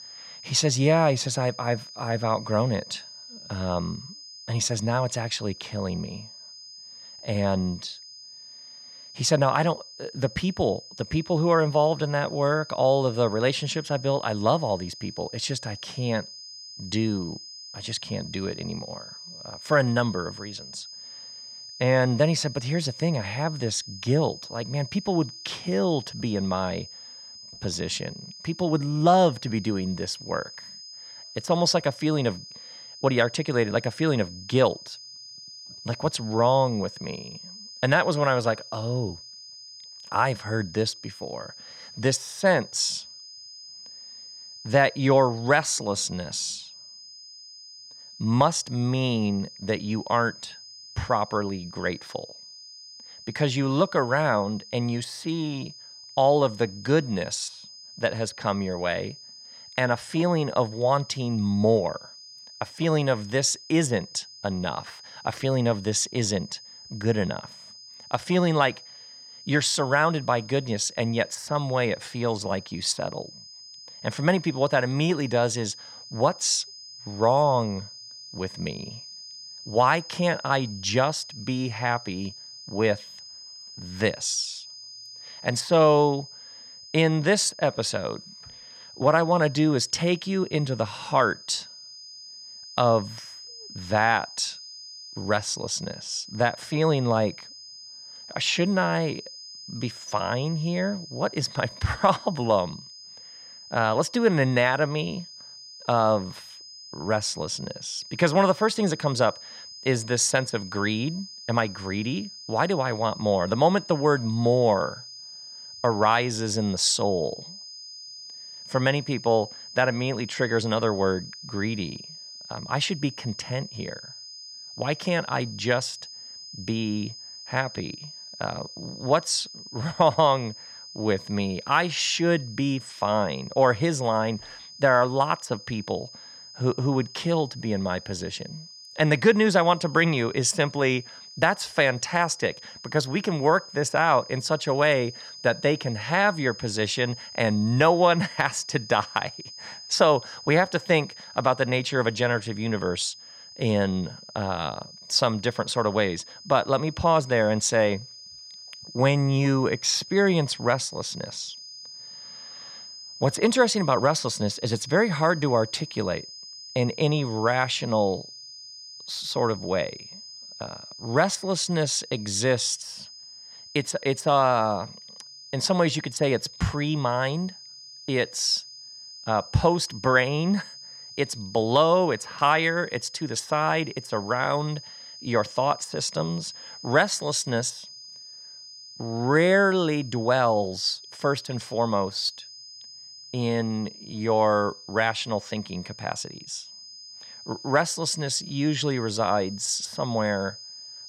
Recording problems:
high-pitched whine; noticeable; throughout; 5 kHz, 15 dB below the speech

